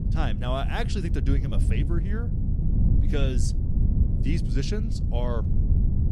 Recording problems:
wind noise on the microphone; heavy; 5 dB below the speech

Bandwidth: 14.5 kHz